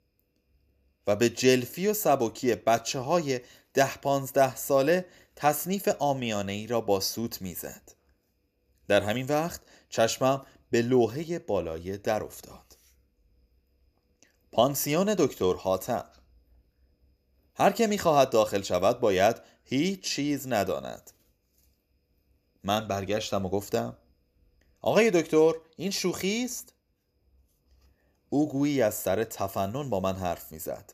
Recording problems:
none

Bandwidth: 14.5 kHz